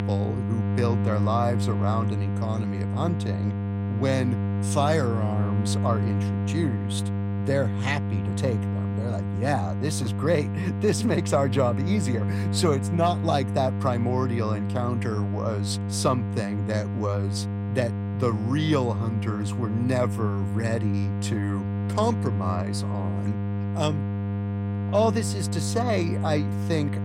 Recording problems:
electrical hum; loud; throughout; 50 Hz, 8 dB below the speech

